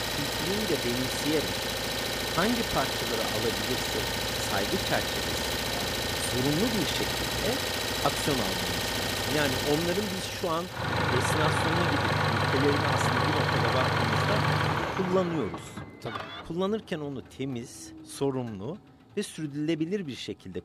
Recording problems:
traffic noise; very loud; throughout; 4 dB above the speech

